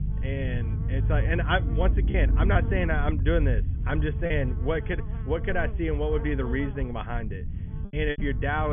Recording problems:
high frequencies cut off; severe; nothing above 3.5 kHz
electrical hum; noticeable; throughout; 60 Hz, 15 dB below the speech
low rumble; noticeable; throughout; 15 dB below the speech
choppy; occasionally; 3% of the speech affected
abrupt cut into speech; at the end

